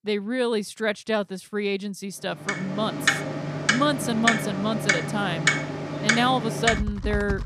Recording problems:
household noises; very loud; from 2.5 s on; 1 dB above the speech

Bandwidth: 14.5 kHz